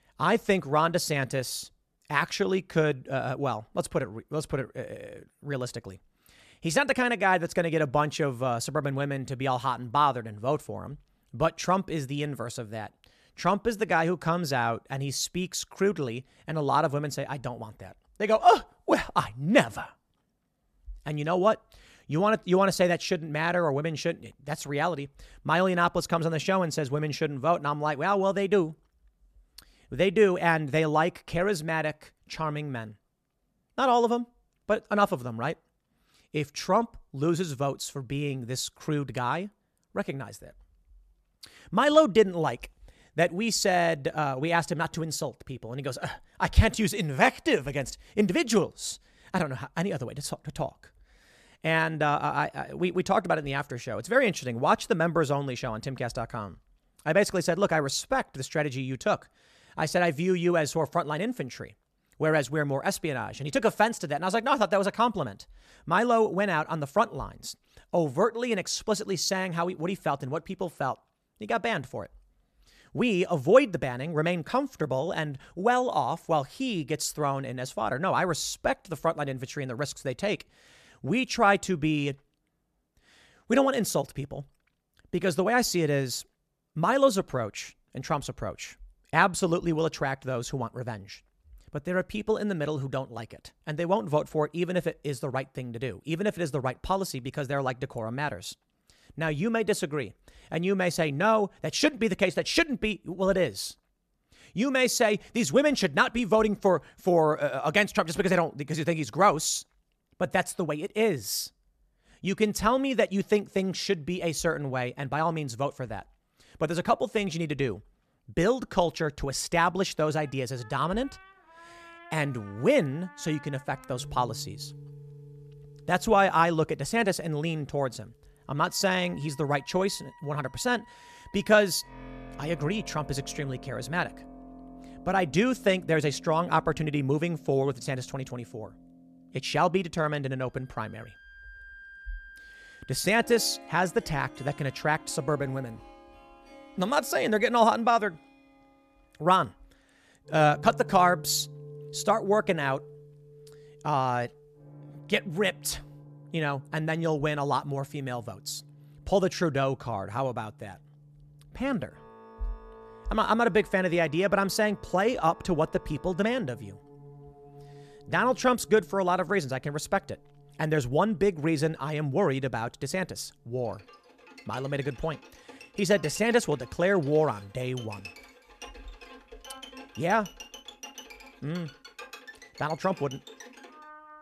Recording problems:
background music; faint; from 2:00 on; 20 dB below the speech

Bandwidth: 14 kHz